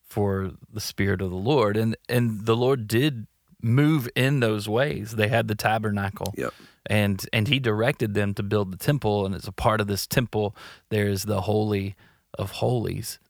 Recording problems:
none

